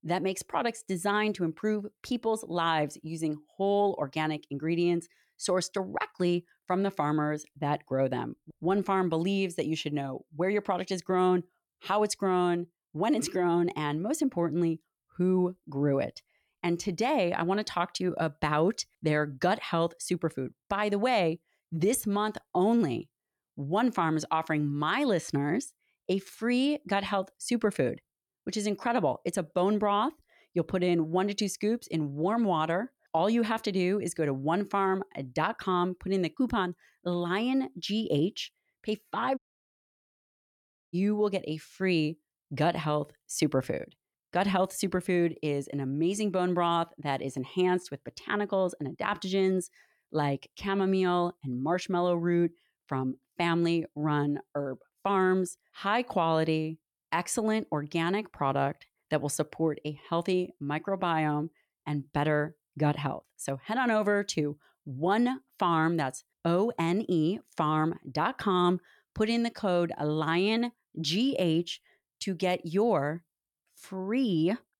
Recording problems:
audio cutting out; at 39 s for 1.5 s

